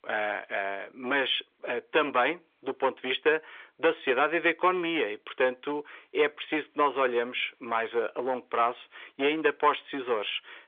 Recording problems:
phone-call audio; nothing above 3.5 kHz
distortion; slight; 4% of the sound clipped

